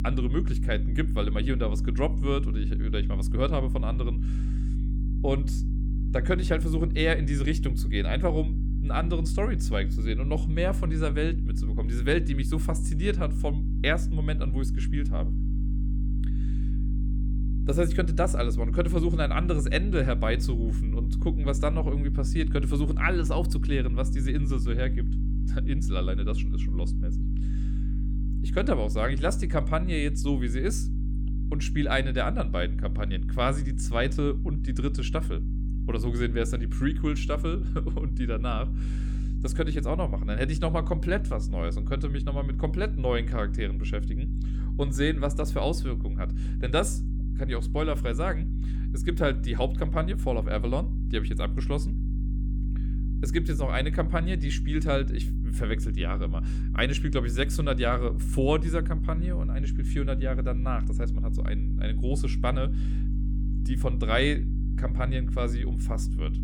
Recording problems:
electrical hum; noticeable; throughout; 50 Hz, 10 dB below the speech

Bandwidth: 18 kHz